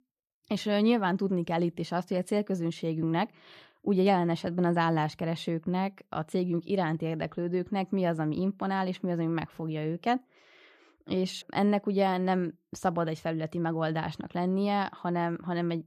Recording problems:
none

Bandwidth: 14.5 kHz